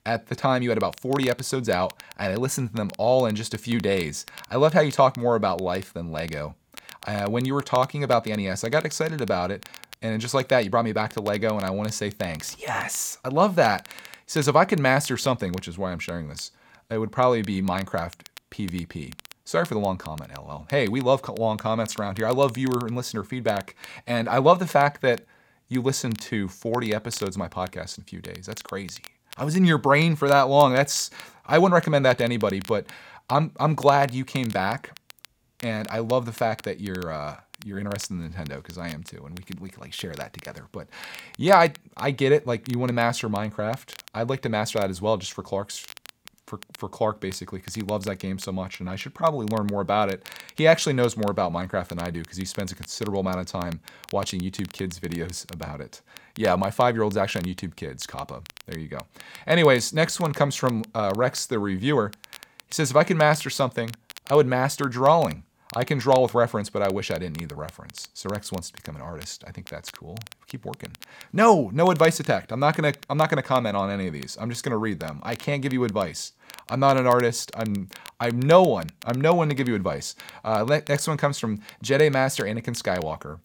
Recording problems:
crackle, like an old record; faint; 20 dB below the speech

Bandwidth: 17.5 kHz